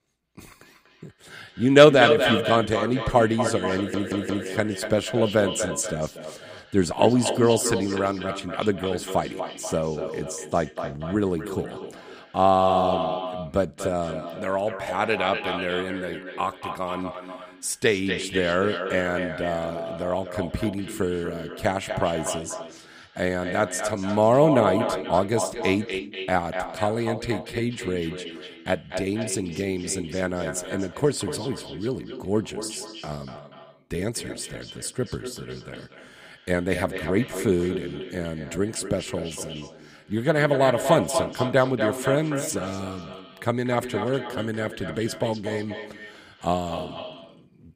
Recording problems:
echo of what is said; strong; throughout; 240 ms later, 7 dB below the speech
audio stuttering; at 4 s

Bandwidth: 15 kHz